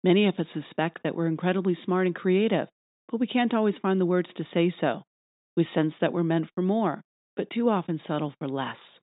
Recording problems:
high frequencies cut off; severe; nothing above 3.5 kHz

